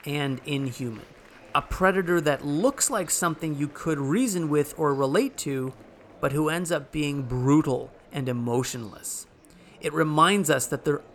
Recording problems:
murmuring crowd; faint; throughout; 25 dB below the speech

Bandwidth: 18.5 kHz